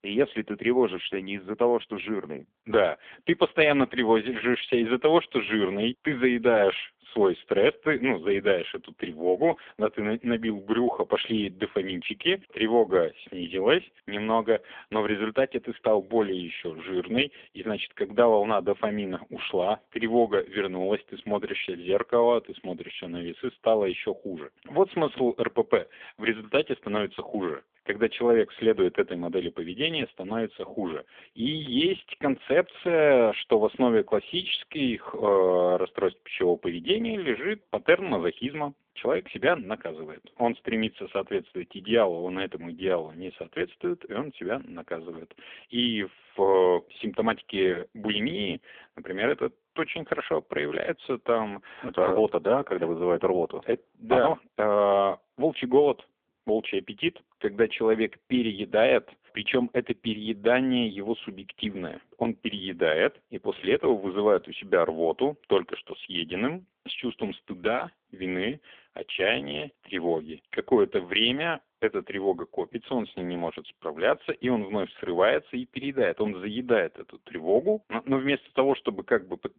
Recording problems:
phone-call audio; poor line; nothing above 3.5 kHz

